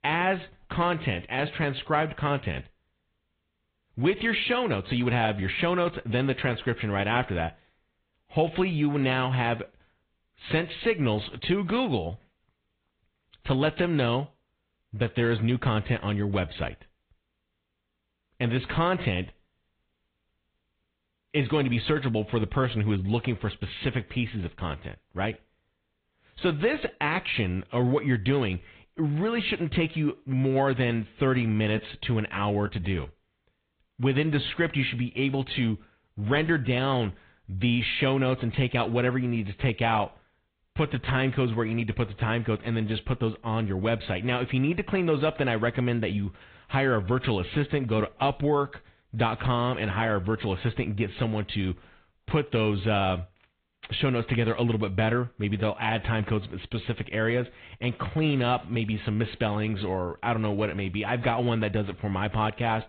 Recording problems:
high frequencies cut off; severe; nothing above 4 kHz
garbled, watery; slightly

